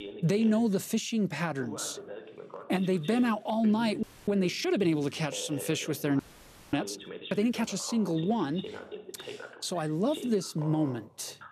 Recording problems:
voice in the background; noticeable; throughout; 15 dB below the speech
audio freezing; at 4 s and at 6 s for 0.5 s

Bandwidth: 14 kHz